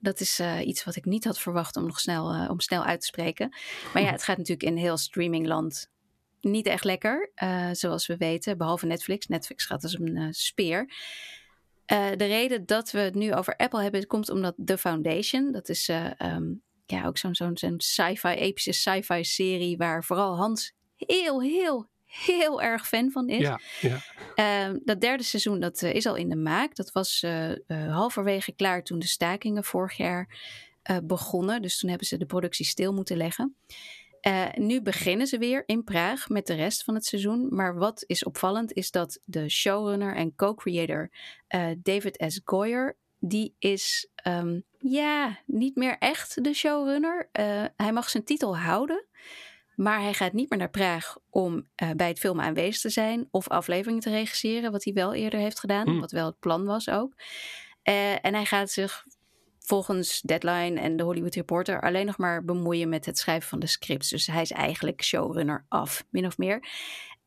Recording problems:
squashed, flat; somewhat

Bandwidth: 14 kHz